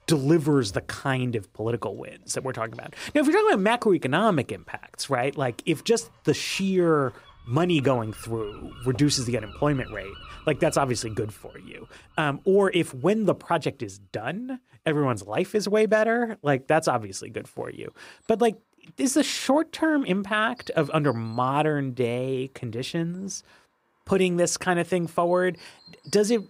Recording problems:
animal sounds; faint; throughout; 25 dB below the speech

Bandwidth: 15.5 kHz